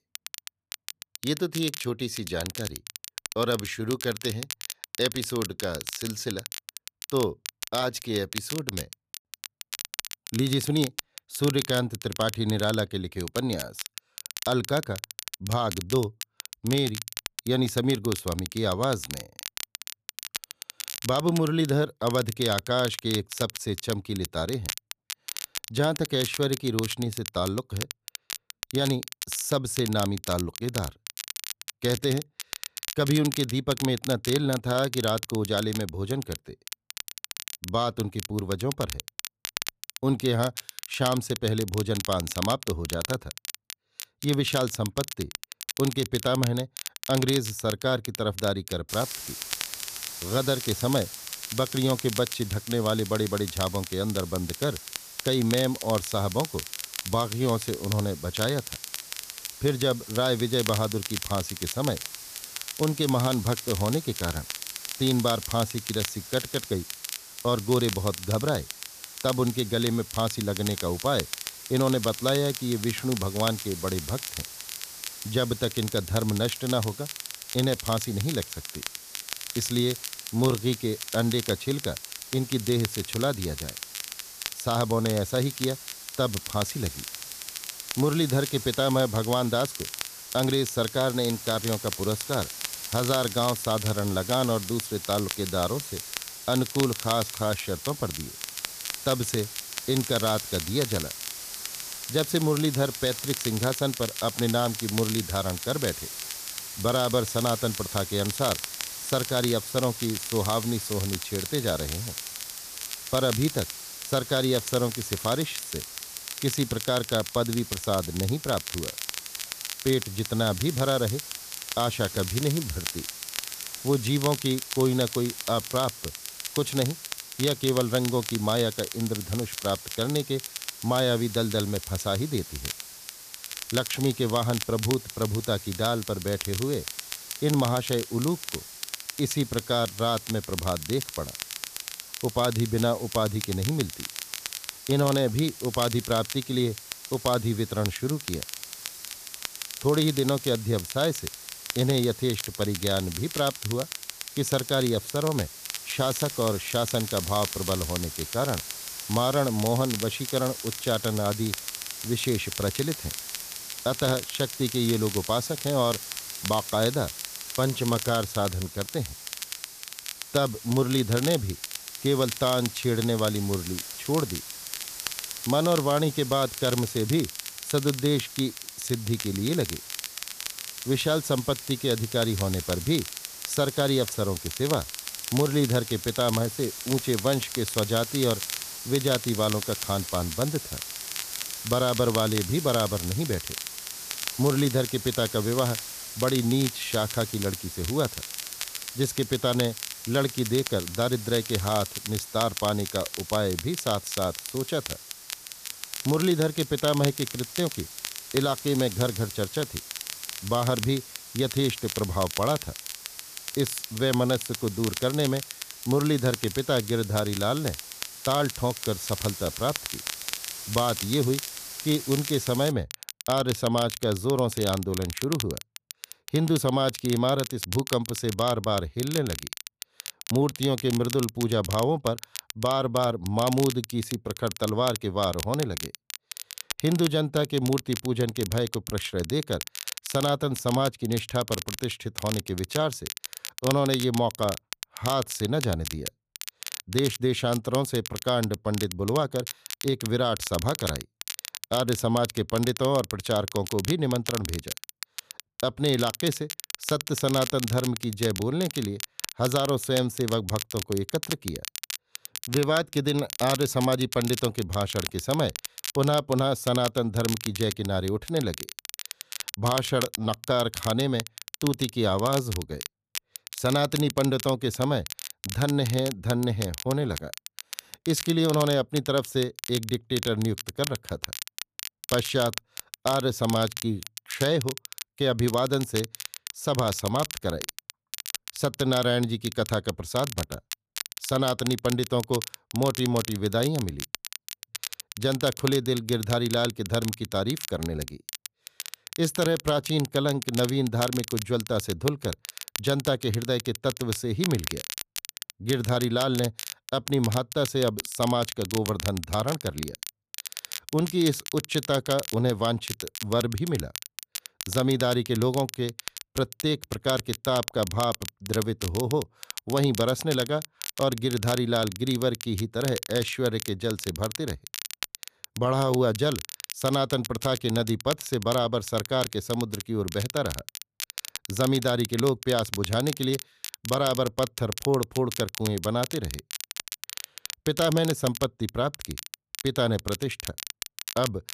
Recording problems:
crackle, like an old record; loud; 9 dB below the speech
hiss; noticeable; from 49 s to 3:43; 10 dB below the speech

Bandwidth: 14.5 kHz